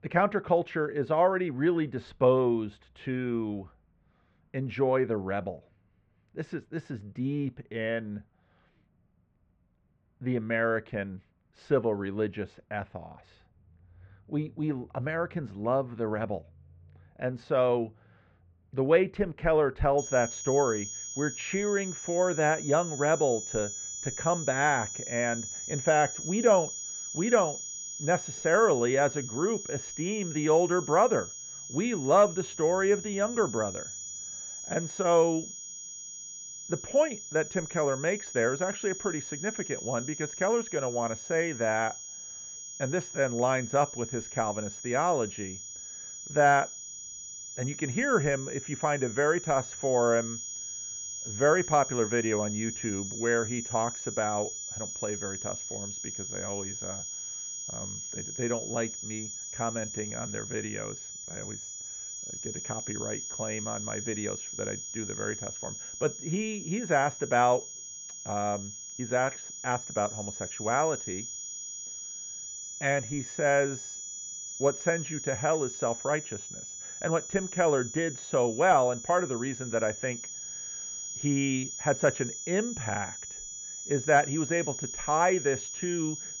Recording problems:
muffled; very; fading above 2.5 kHz
high-pitched whine; loud; from 20 s on; 6.5 kHz, 8 dB below the speech

